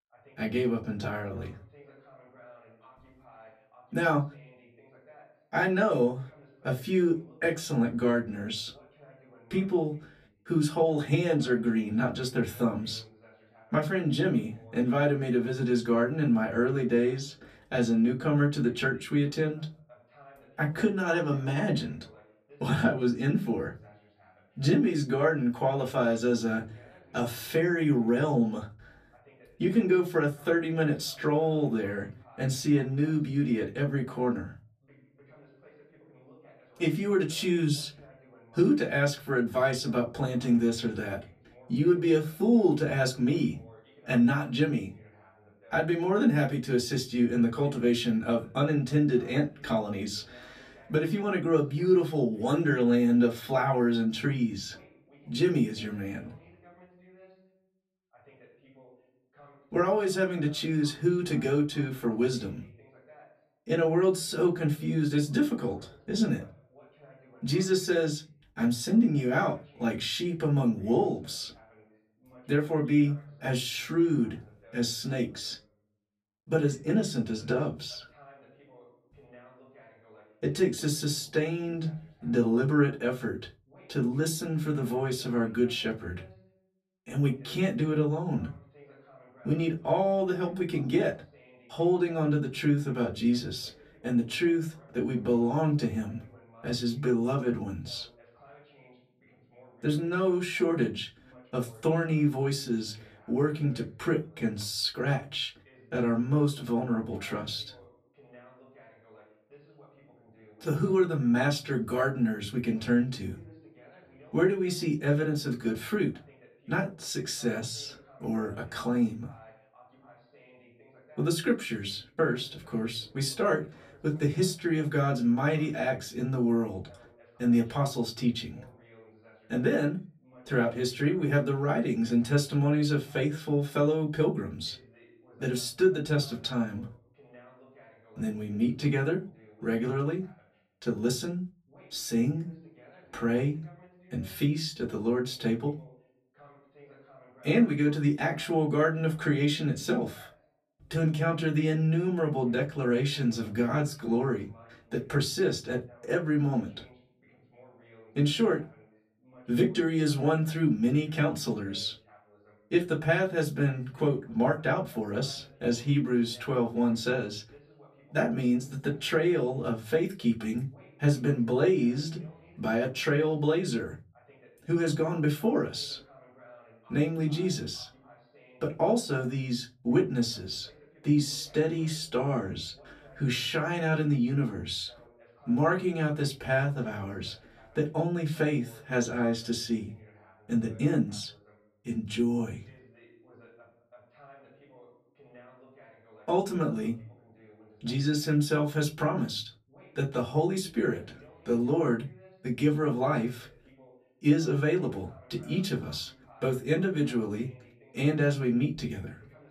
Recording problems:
off-mic speech; far
room echo; very slight; dies away in 0.3 s
voice in the background; faint; throughout; 30 dB below the speech

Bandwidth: 14.5 kHz